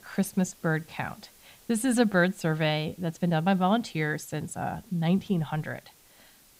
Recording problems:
hiss; faint; throughout; 25 dB below the speech

